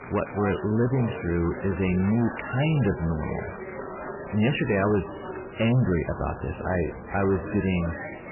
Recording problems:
garbled, watery; badly; nothing above 3 kHz
distortion; slight; 7% of the sound clipped
rain or running water; noticeable; throughout; 20 dB below the speech
chatter from many people; noticeable; throughout; 10 dB below the speech

